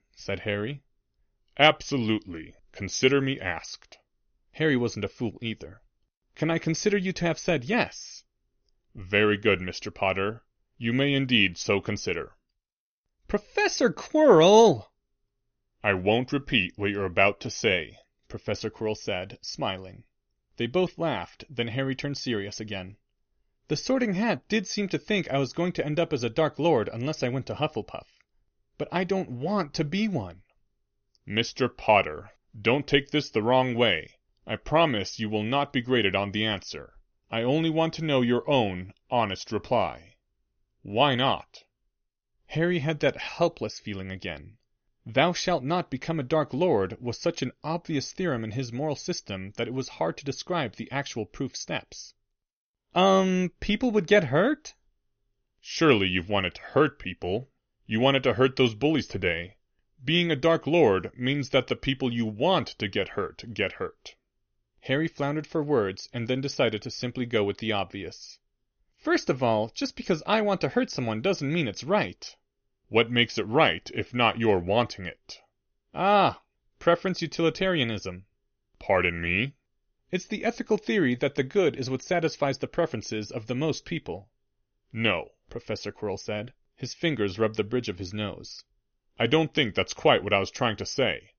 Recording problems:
high frequencies cut off; noticeable; nothing above 6.5 kHz

